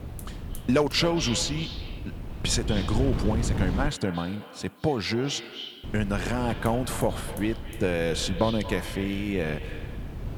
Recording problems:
echo of what is said; noticeable; throughout; 220 ms later, 10 dB below the speech
wind noise on the microphone; occasional gusts; until 4 s and from 6 s on; 15 dB below the speech
hiss; faint; throughout; 25 dB below the speech

